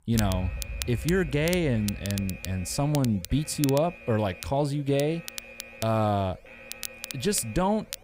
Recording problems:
crackle, like an old record; noticeable; 10 dB below the speech
alarm; noticeable; peak 7 dB below the speech

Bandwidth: 15.5 kHz